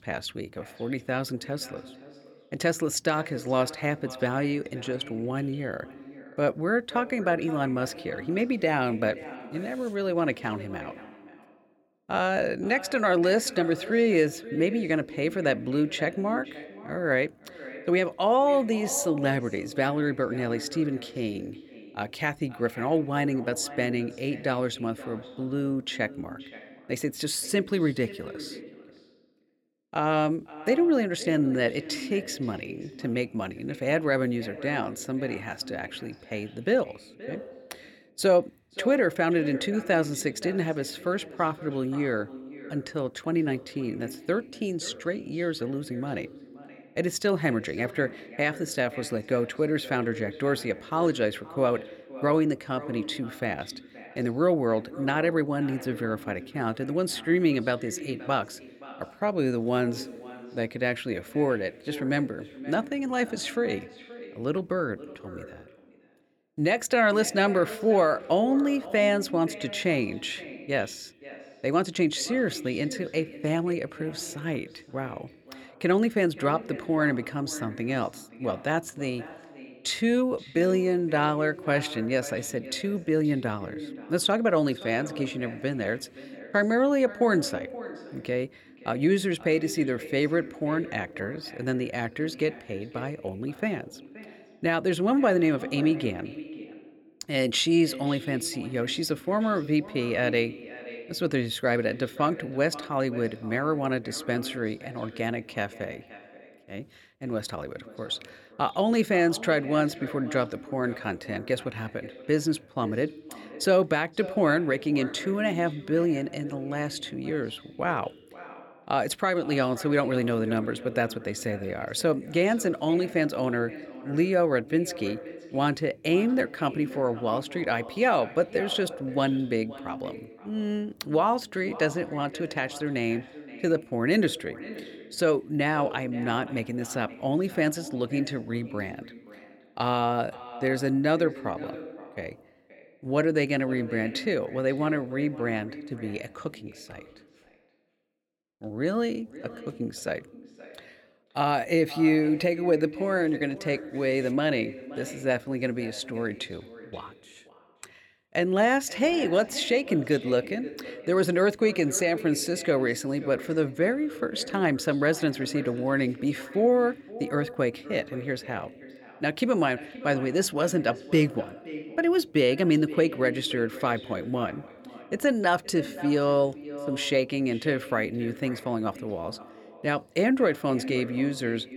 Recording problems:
echo of what is said; noticeable; throughout; 520 ms later, 15 dB below the speech

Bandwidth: 17 kHz